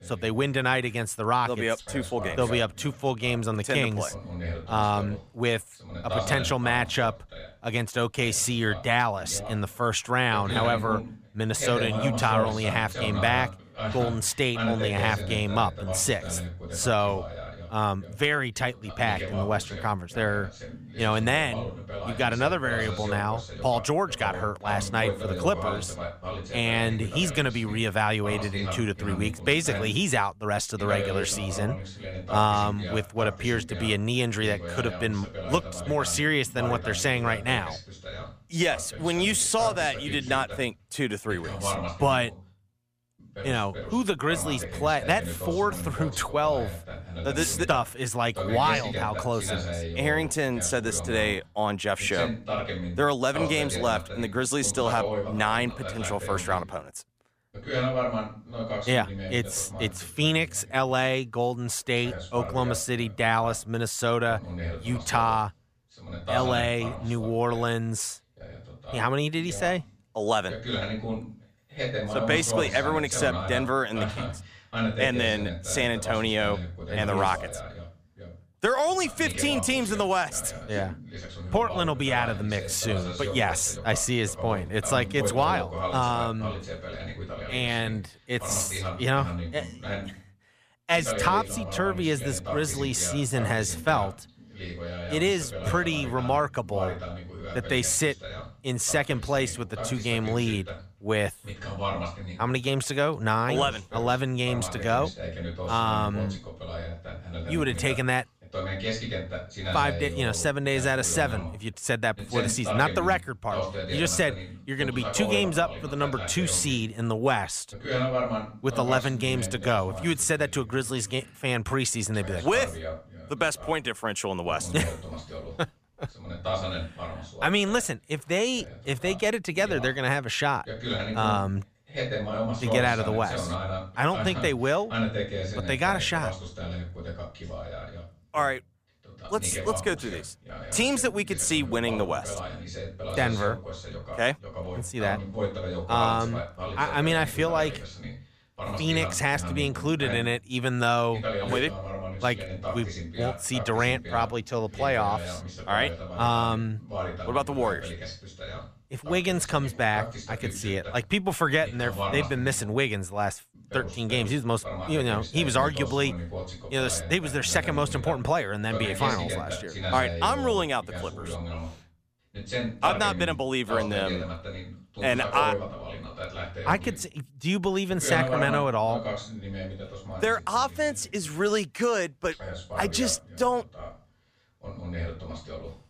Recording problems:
voice in the background; loud; throughout; 8 dB below the speech

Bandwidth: 15 kHz